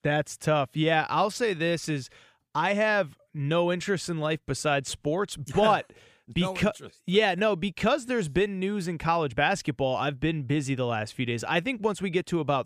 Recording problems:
none

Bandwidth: 15 kHz